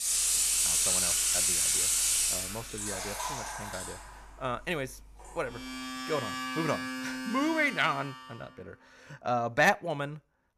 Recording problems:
household noises; very loud; until 8 s; 5 dB above the speech

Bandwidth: 14.5 kHz